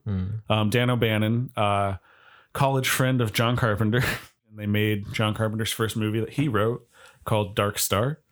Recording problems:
none

